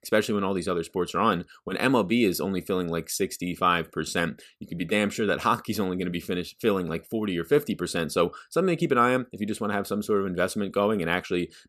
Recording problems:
none

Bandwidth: 14 kHz